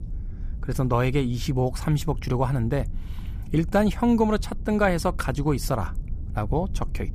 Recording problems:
low rumble; faint; throughout; 25 dB below the speech

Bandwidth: 15 kHz